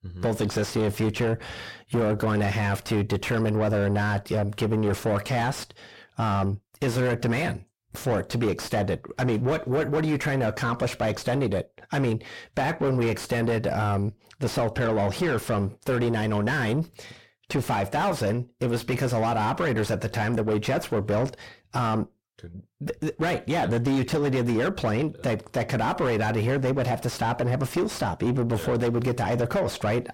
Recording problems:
distortion; heavy; 6 dB below the speech

